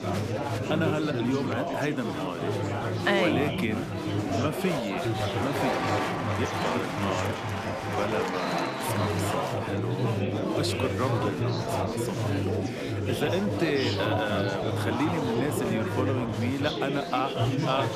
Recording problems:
murmuring crowd; very loud; throughout; 2 dB above the speech

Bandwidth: 14.5 kHz